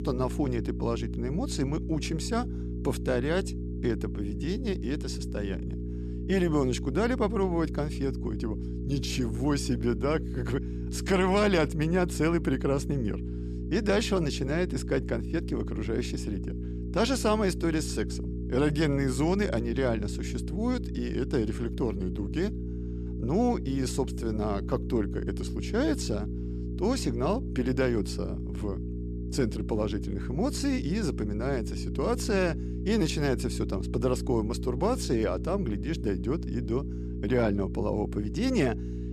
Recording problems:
electrical hum; noticeable; throughout; 60 Hz, 10 dB below the speech

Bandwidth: 14 kHz